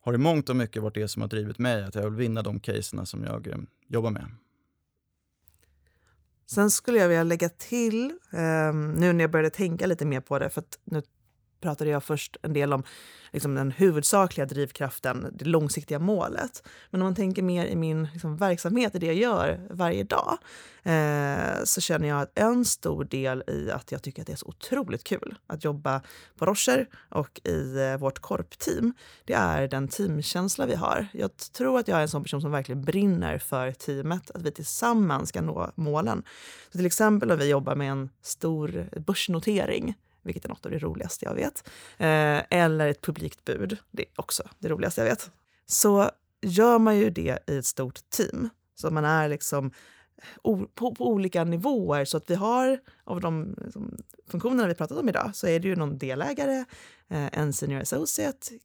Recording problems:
none

